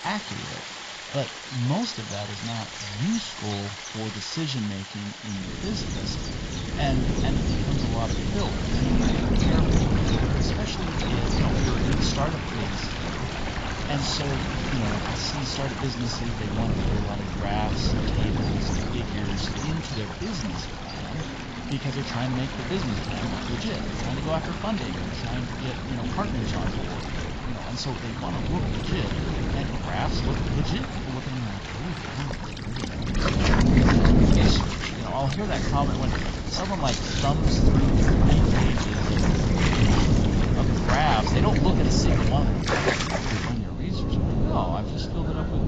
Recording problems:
garbled, watery; badly; nothing above 7.5 kHz
wind noise on the microphone; heavy; from 5.5 s on; 1 dB below the speech
rain or running water; loud; throughout; 3 dB below the speech
animal sounds; noticeable; throughout; 15 dB below the speech

